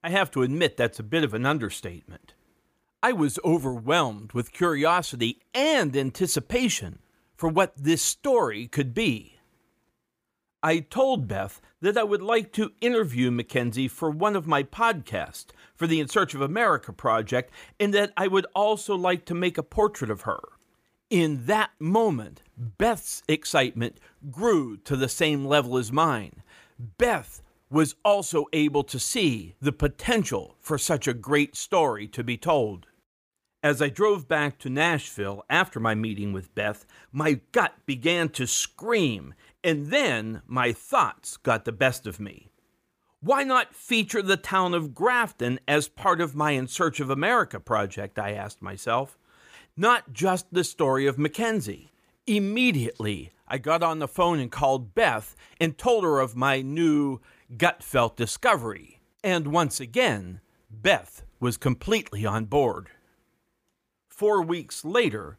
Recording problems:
none

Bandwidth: 15 kHz